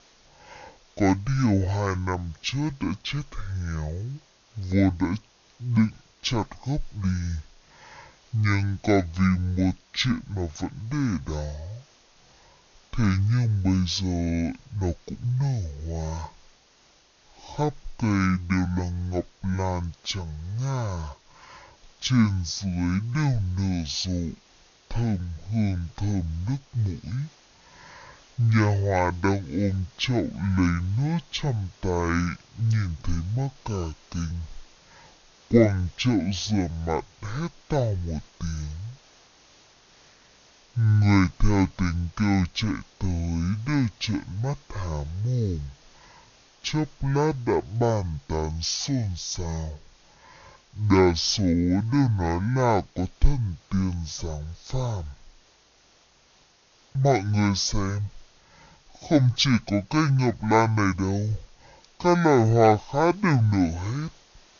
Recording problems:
wrong speed and pitch; too slow and too low; 0.5 times normal speed
high frequencies cut off; noticeable; nothing above 7 kHz
hiss; faint; throughout; 30 dB below the speech

